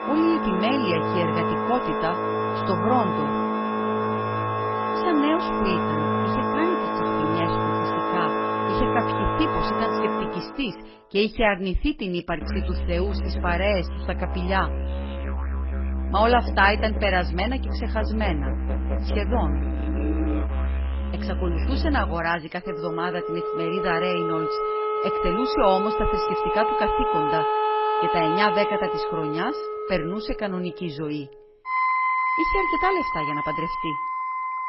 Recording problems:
garbled, watery; badly; nothing above 5.5 kHz
background music; very loud; throughout; 1 dB above the speech

